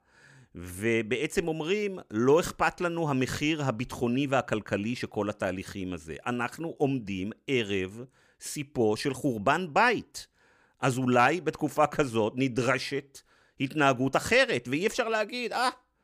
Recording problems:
none

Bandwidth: 15 kHz